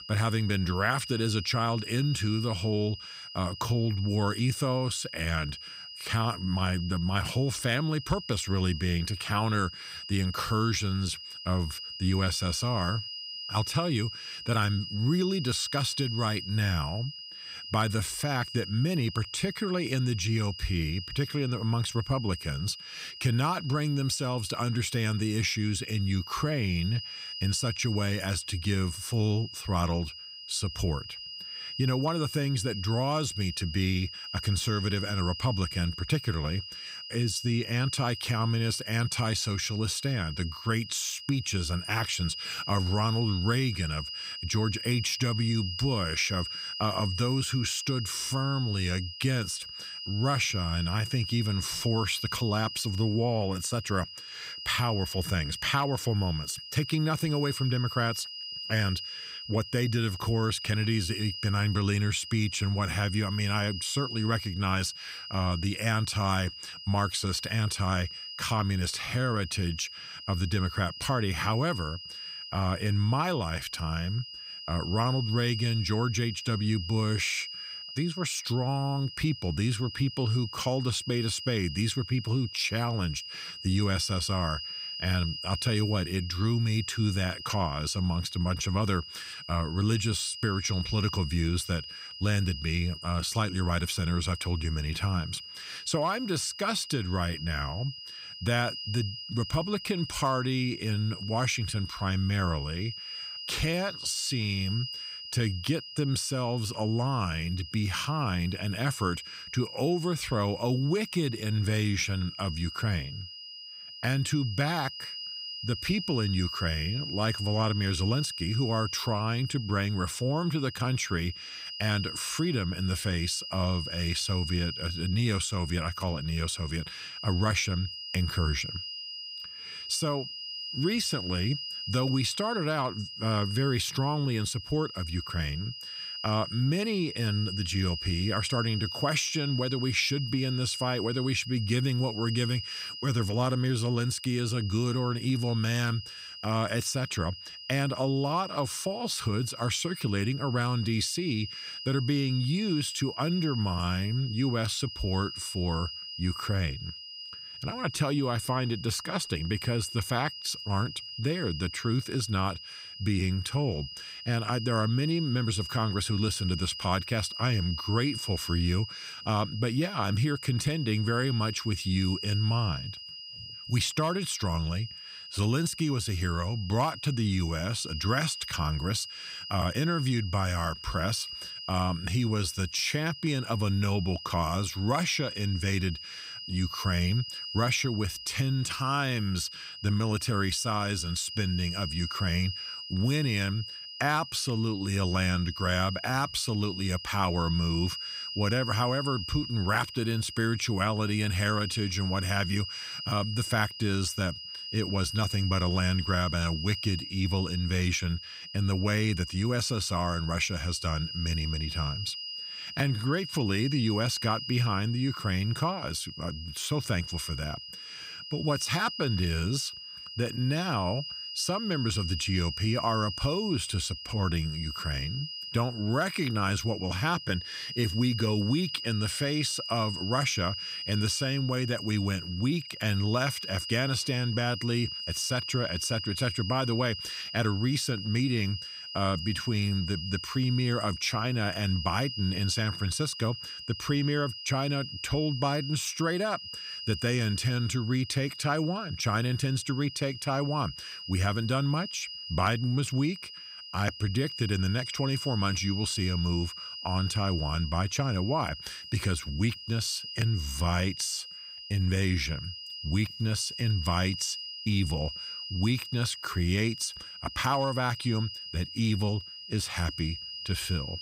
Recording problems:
high-pitched whine; loud; throughout; 5 kHz, 8 dB below the speech

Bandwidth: 15.5 kHz